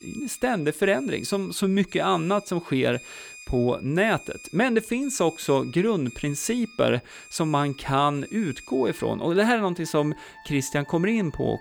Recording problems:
alarms or sirens; noticeable; throughout; 20 dB below the speech

